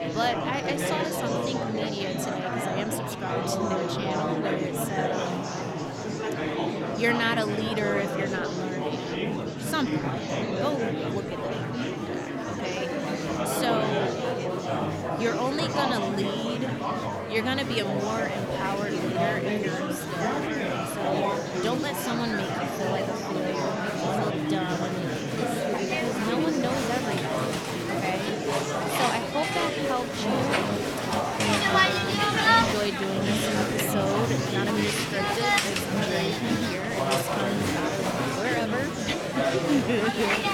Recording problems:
murmuring crowd; very loud; throughout; 4 dB above the speech

